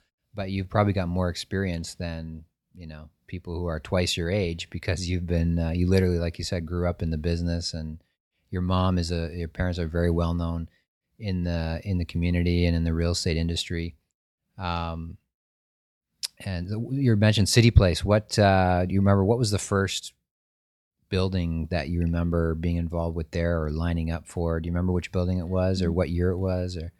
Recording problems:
none

